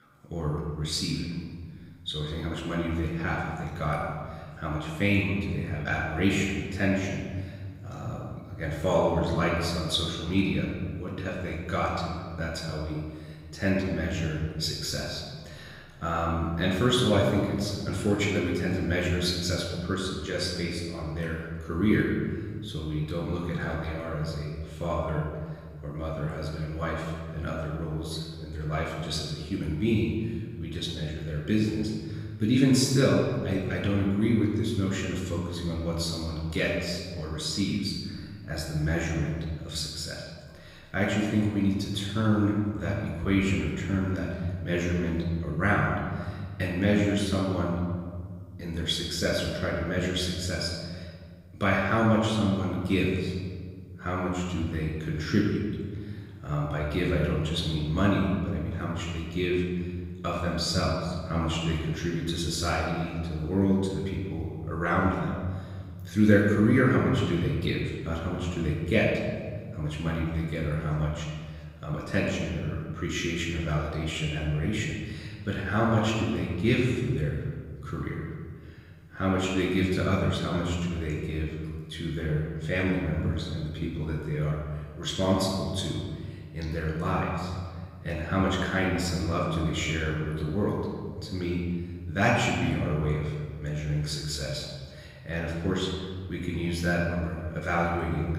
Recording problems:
off-mic speech; far
room echo; noticeable; dies away in 1.8 s

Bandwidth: 15.5 kHz